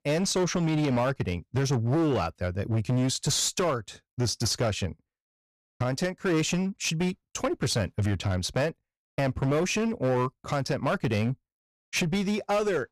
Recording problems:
distortion; slight; 14% of the sound clipped

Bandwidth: 14.5 kHz